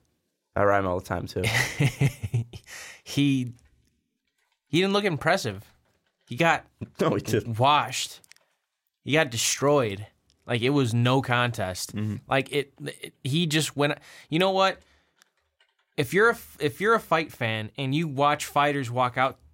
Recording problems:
none

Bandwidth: 16 kHz